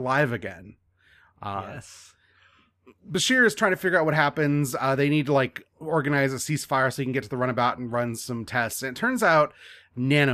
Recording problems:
abrupt cut into speech; at the start and the end

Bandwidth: 14.5 kHz